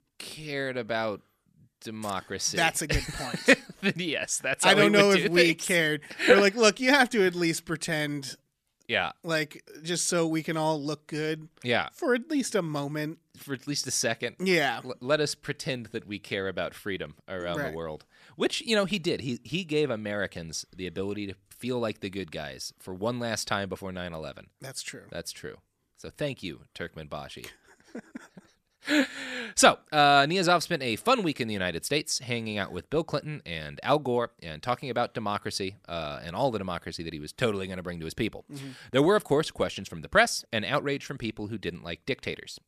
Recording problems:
none

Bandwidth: 14.5 kHz